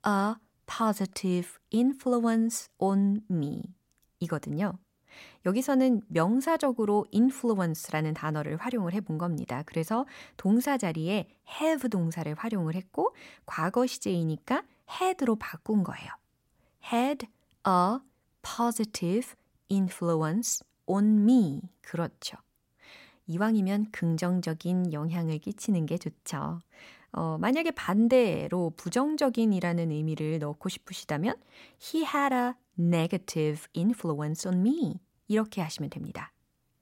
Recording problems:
none

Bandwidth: 16 kHz